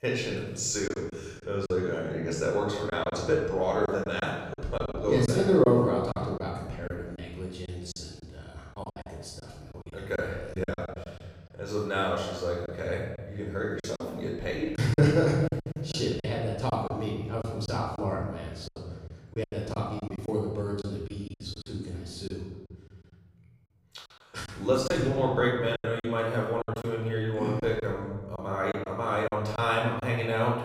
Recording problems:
off-mic speech; far
room echo; noticeable; dies away in 1.4 s
choppy; very; 8% of the speech affected

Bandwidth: 15.5 kHz